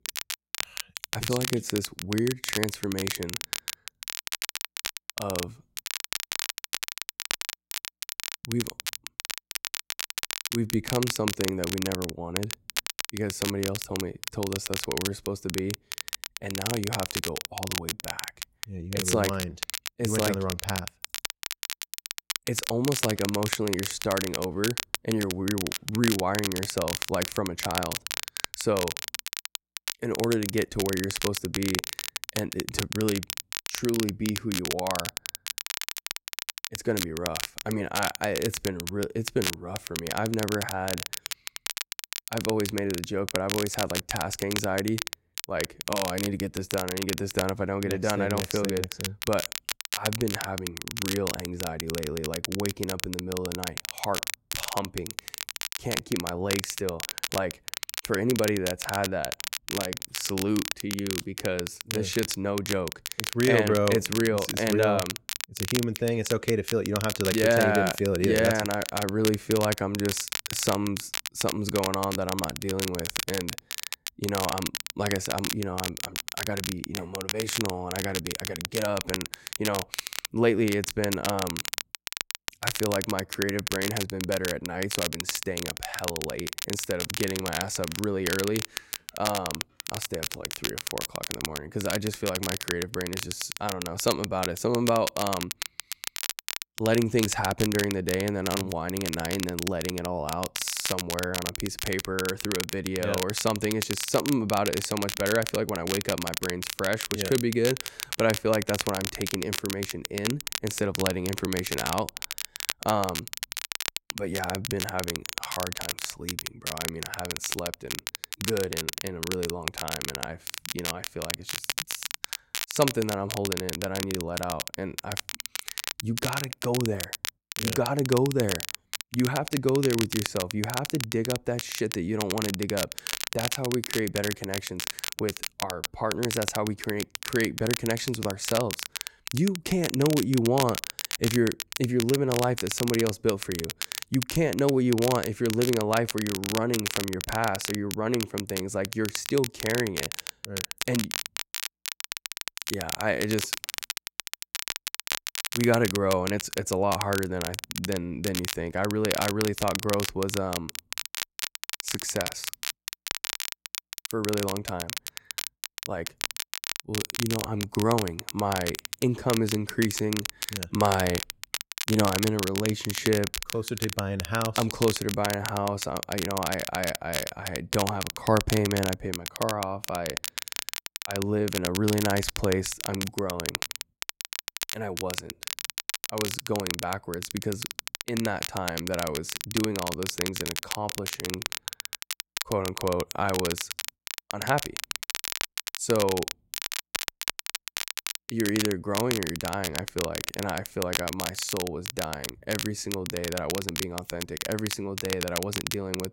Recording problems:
crackle, like an old record; loud; 3 dB below the speech

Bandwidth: 16 kHz